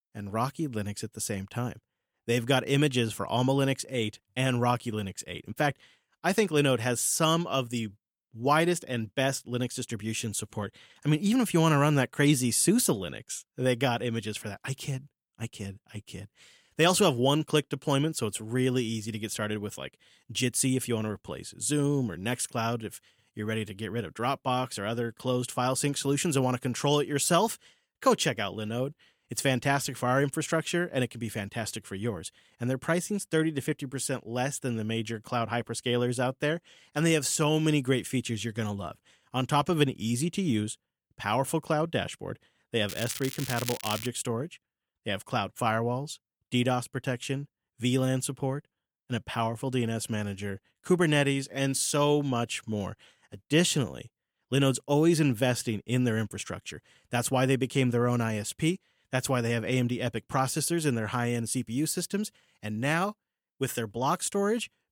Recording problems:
crackling; loud; from 43 to 44 s; 8 dB below the speech

